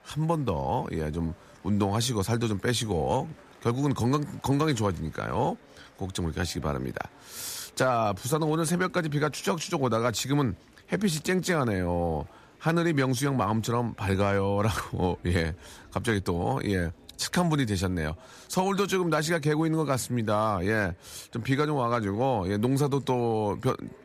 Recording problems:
murmuring crowd; faint; throughout; 30 dB below the speech

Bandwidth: 14.5 kHz